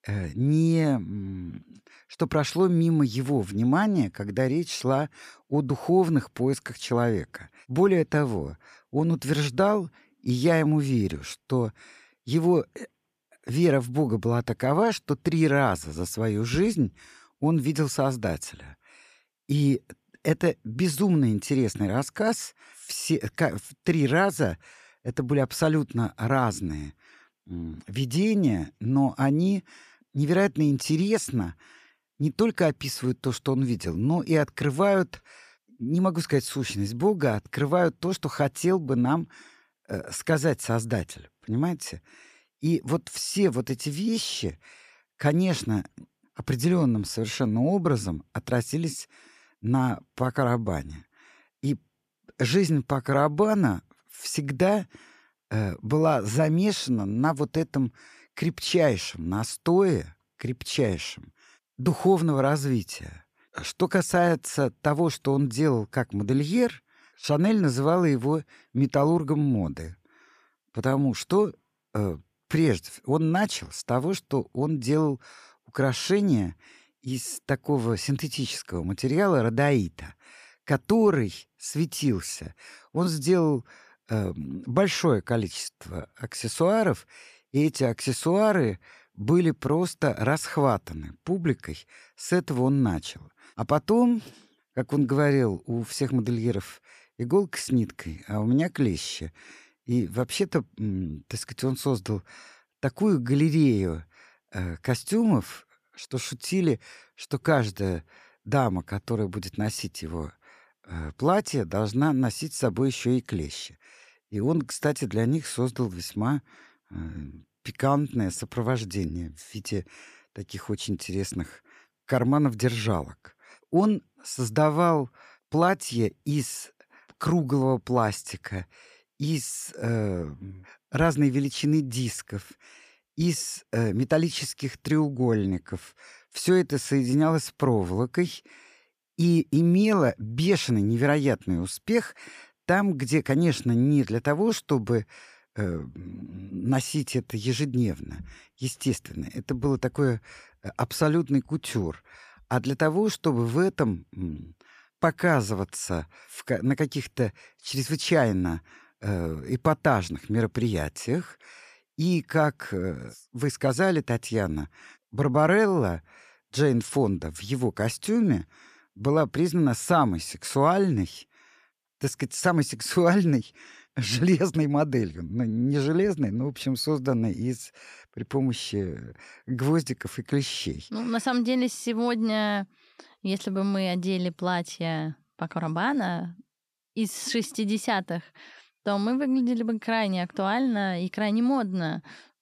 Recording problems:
none

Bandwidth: 14.5 kHz